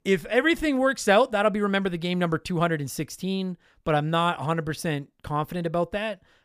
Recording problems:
none

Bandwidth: 15 kHz